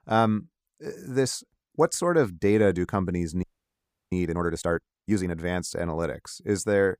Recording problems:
audio freezing; at 3.5 s for 0.5 s

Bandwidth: 15 kHz